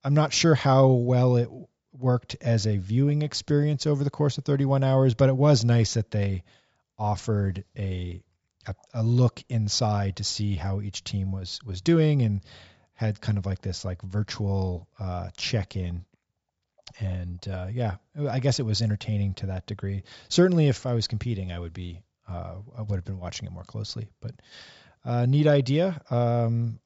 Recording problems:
high frequencies cut off; noticeable; nothing above 8 kHz

